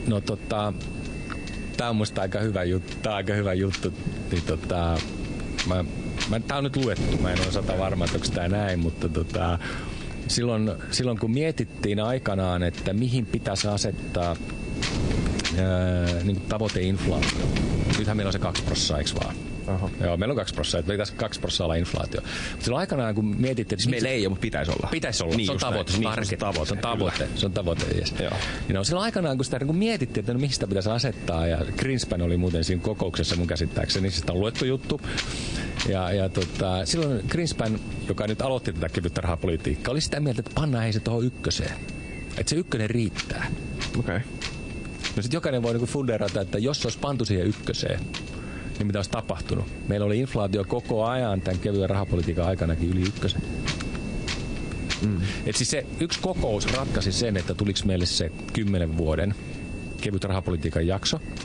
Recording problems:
garbled, watery; slightly; nothing above 9 kHz
squashed, flat; somewhat
wind noise on the microphone; heavy; 8 dB below the speech
high-pitched whine; faint; throughout; 2.5 kHz, 20 dB below the speech

